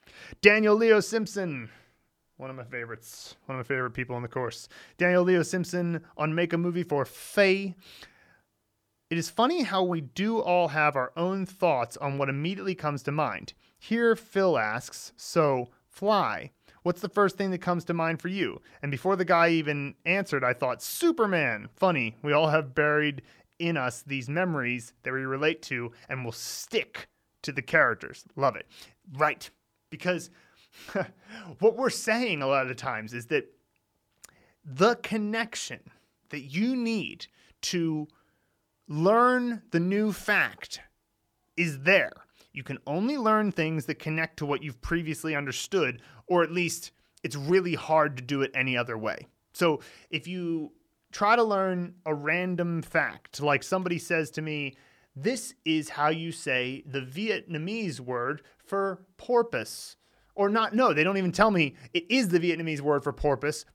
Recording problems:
none

